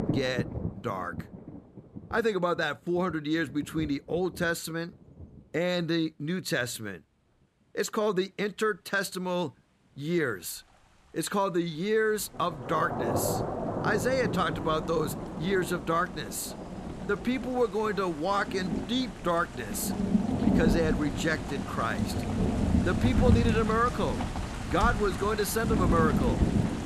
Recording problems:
rain or running water; loud; throughout; 1 dB below the speech

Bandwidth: 14.5 kHz